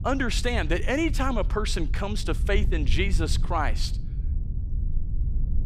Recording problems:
low rumble; noticeable; throughout; 20 dB below the speech

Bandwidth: 15.5 kHz